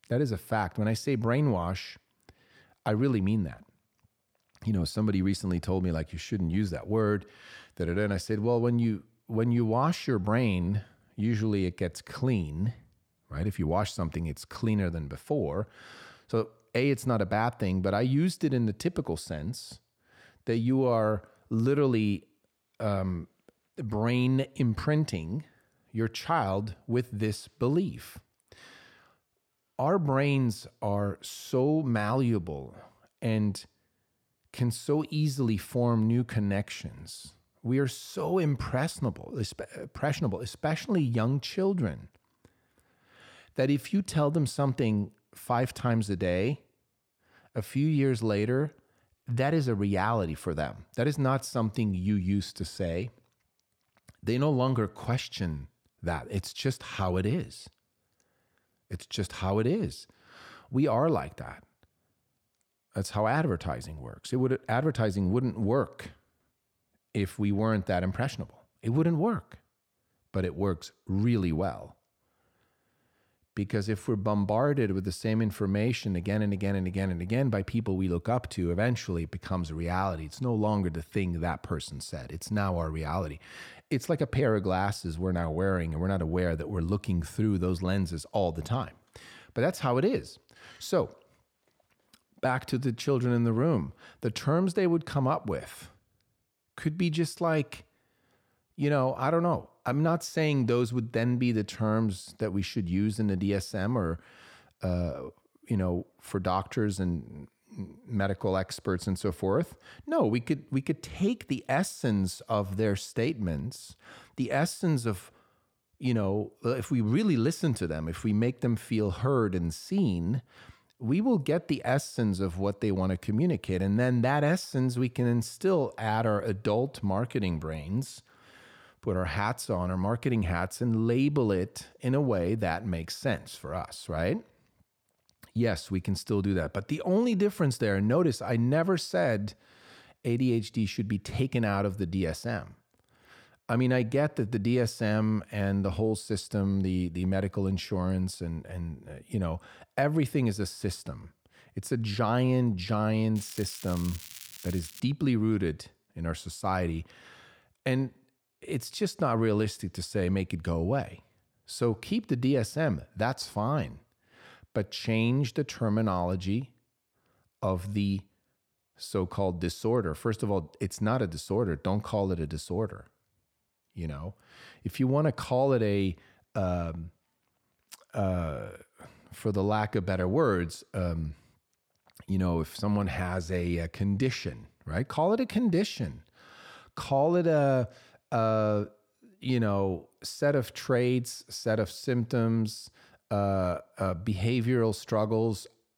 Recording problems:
crackling; noticeable; from 2:33 to 2:35; 15 dB below the speech

